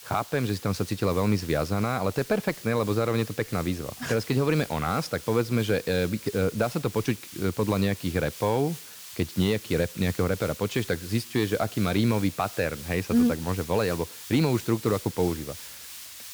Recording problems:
hiss; noticeable; throughout; 15 dB below the speech

